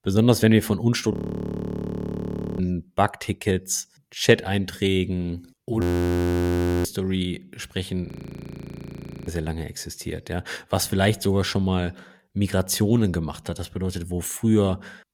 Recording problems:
audio freezing; at 1 s for 1.5 s, at 6 s for 1 s and at 8 s for 1 s

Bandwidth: 17 kHz